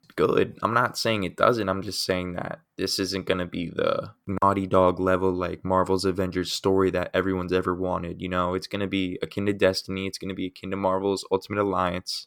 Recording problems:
none

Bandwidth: 18 kHz